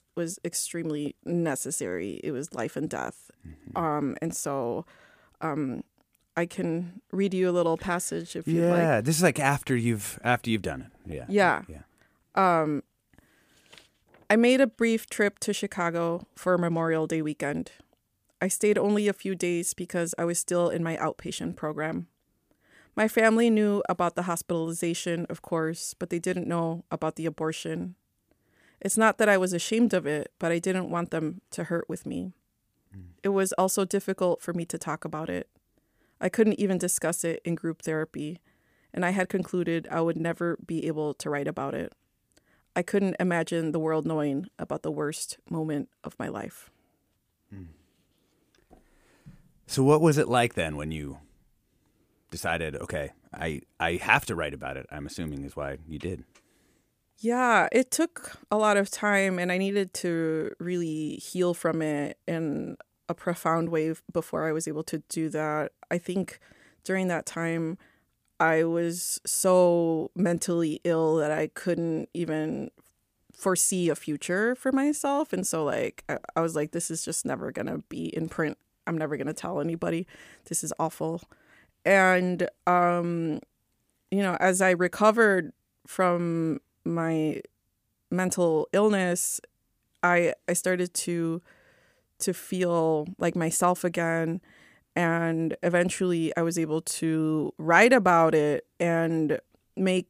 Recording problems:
none

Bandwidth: 15 kHz